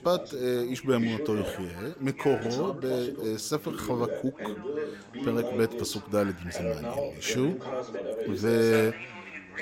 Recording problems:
background chatter; loud; throughout; 3 voices, 6 dB below the speech

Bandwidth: 16 kHz